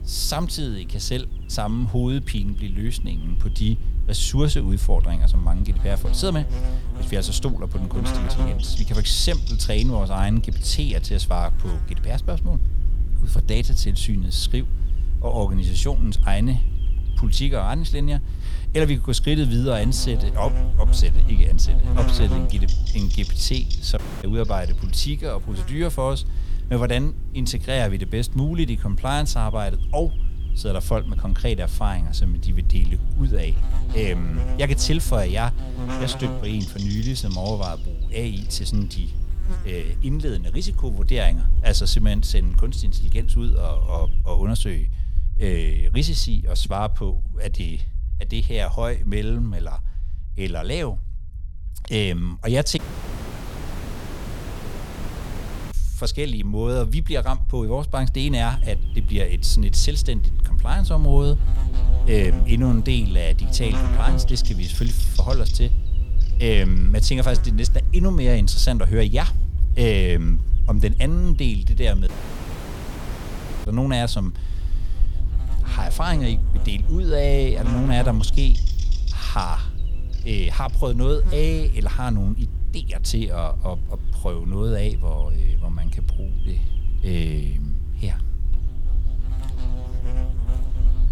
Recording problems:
electrical hum; noticeable; until 44 s and from 58 s on; 50 Hz, 15 dB below the speech
low rumble; noticeable; throughout; 20 dB below the speech
audio cutting out; at 24 s, at 53 s for 3 s and at 1:12 for 1.5 s

